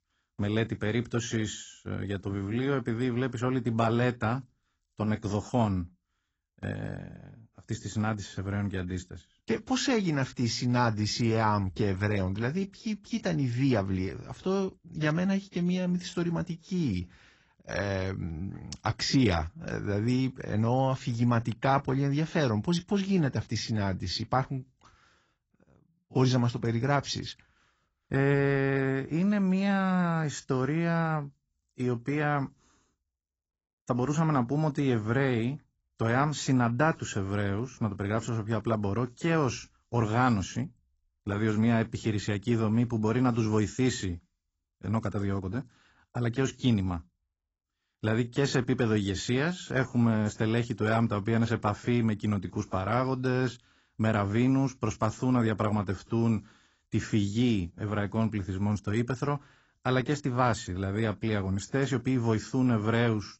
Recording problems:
garbled, watery; badly; nothing above 7.5 kHz

